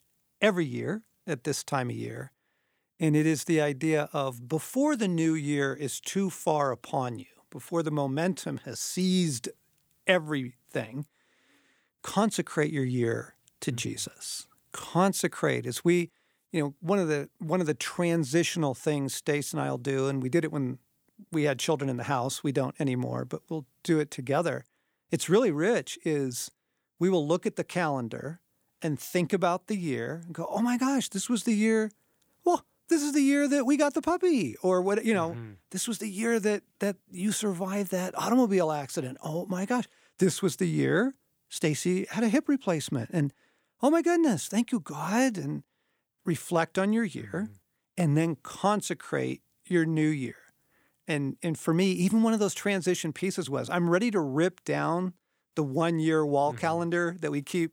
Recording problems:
none

